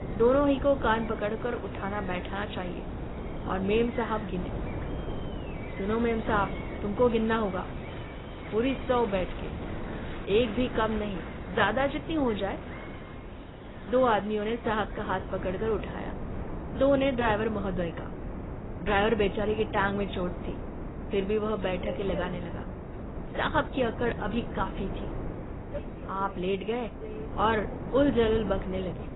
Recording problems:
garbled, watery; badly; nothing above 4 kHz
train or aircraft noise; noticeable; throughout; 20 dB below the speech
wind noise on the microphone; occasional gusts; 15 dB below the speech
animal sounds; faint; throughout; 25 dB below the speech

